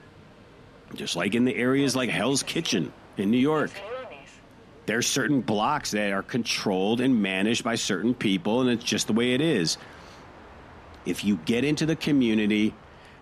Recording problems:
train or aircraft noise; faint; throughout; 20 dB below the speech

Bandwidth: 14 kHz